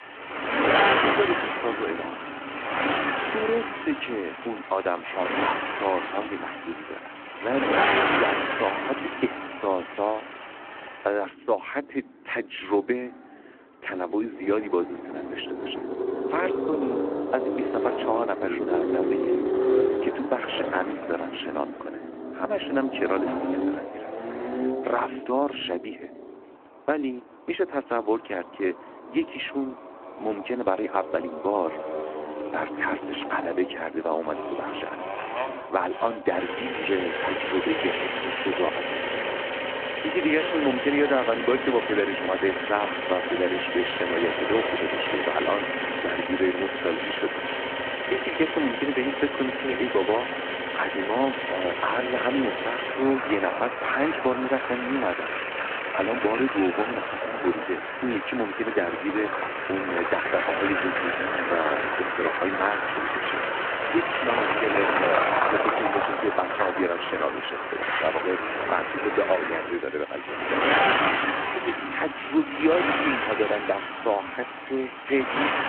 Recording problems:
phone-call audio
traffic noise; very loud; throughout; 1 dB above the speech

